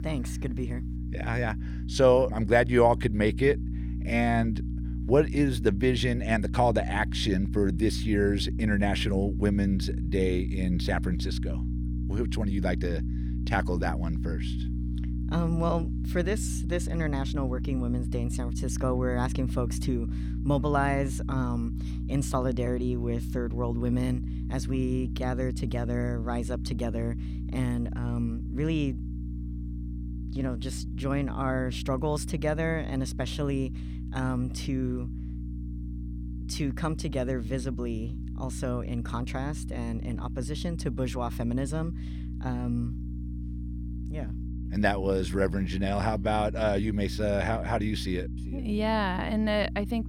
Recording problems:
electrical hum; noticeable; throughout; 60 Hz, 15 dB below the speech

